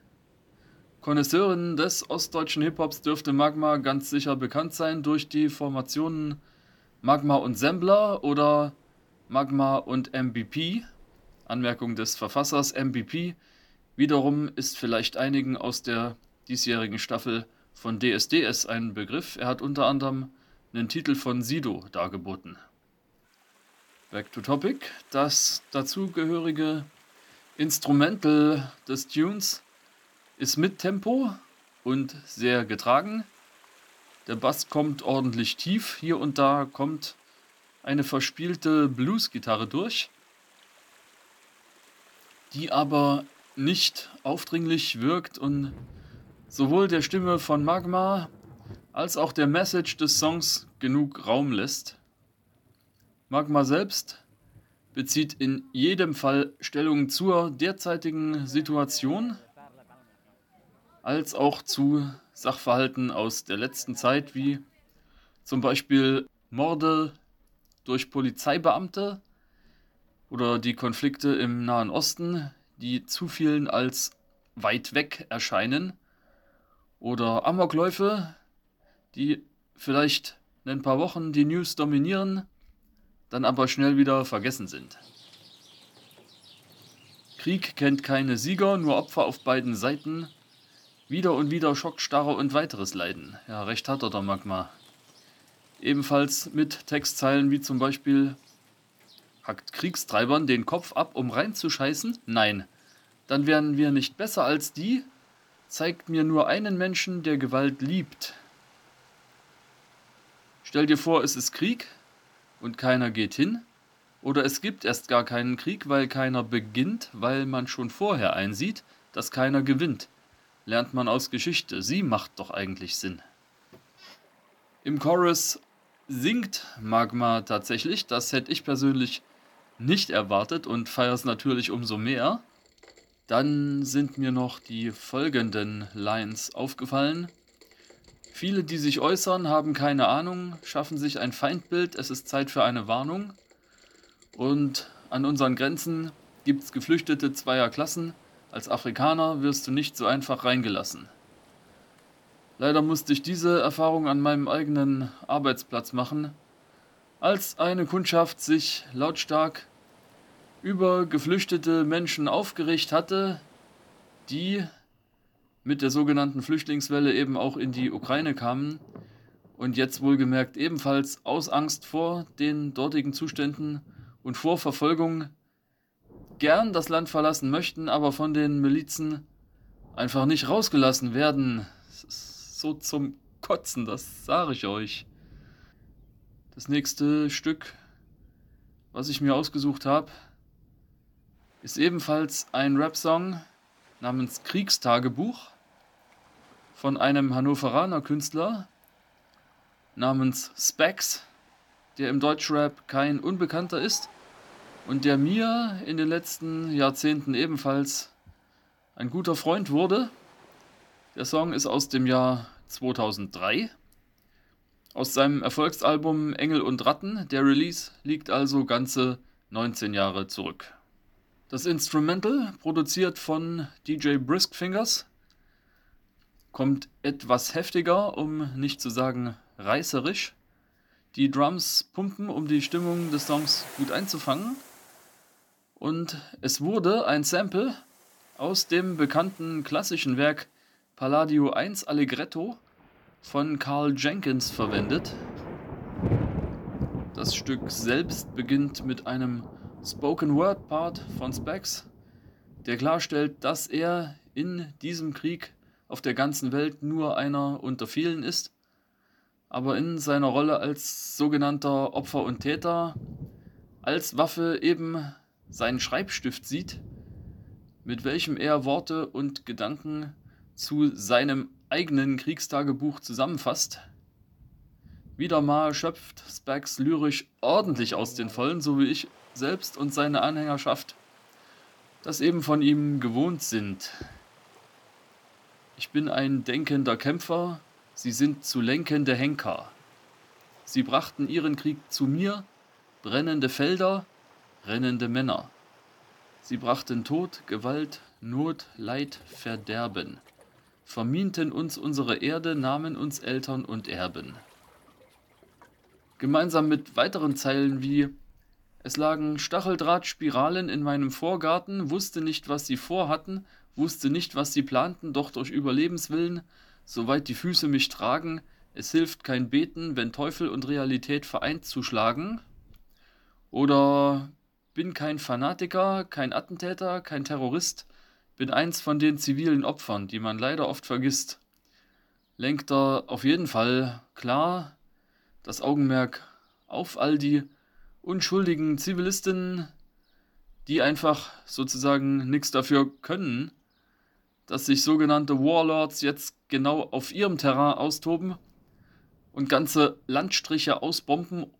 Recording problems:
rain or running water; faint; throughout; 20 dB below the speech

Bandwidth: 18 kHz